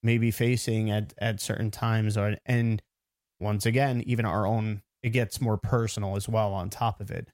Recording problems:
uneven, jittery; strongly; from 1 to 6.5 s

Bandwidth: 16 kHz